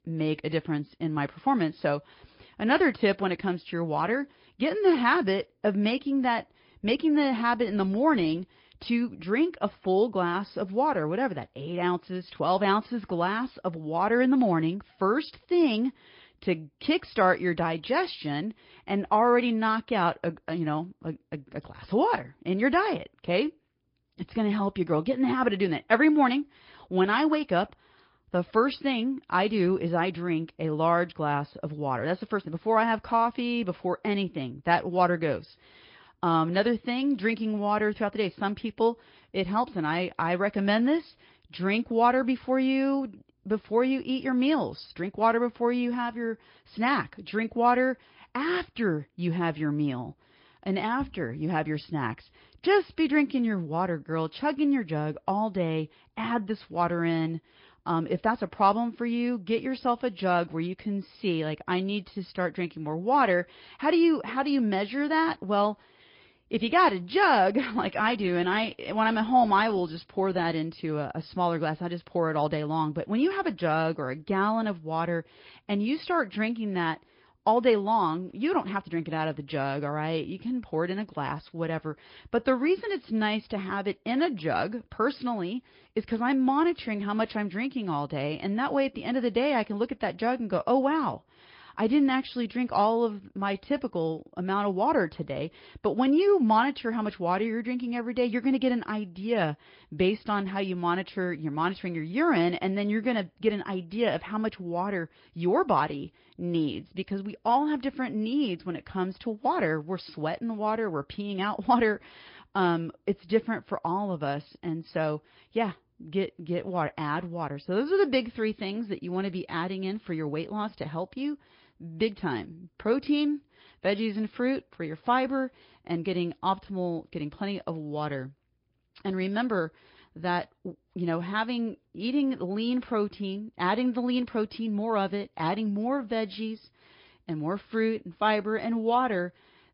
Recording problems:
high frequencies cut off; noticeable; nothing above 5 kHz
garbled, watery; slightly

